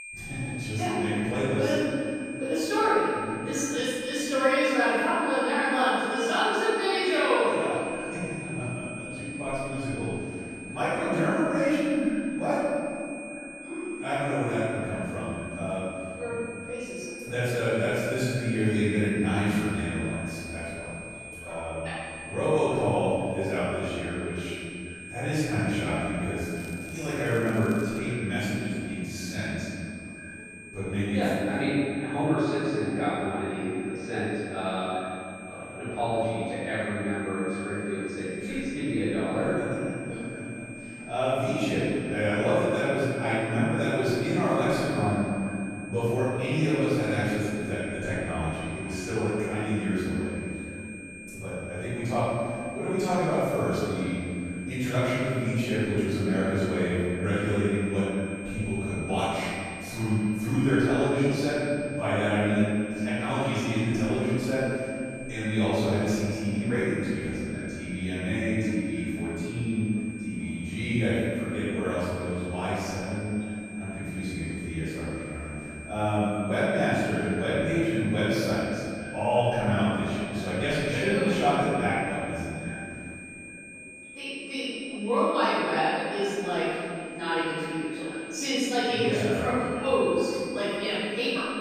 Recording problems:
room echo; strong; dies away in 2.6 s
off-mic speech; far
echo of what is said; faint; throughout; 420 ms later, 20 dB below the speech
high-pitched whine; noticeable; throughout; 2.5 kHz, 15 dB below the speech
background chatter; faint; throughout; 2 voices, 25 dB below the speech
crackling; faint; from 27 to 28 s; 25 dB below the speech

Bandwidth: 15 kHz